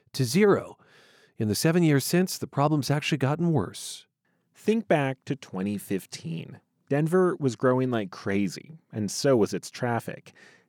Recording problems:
none

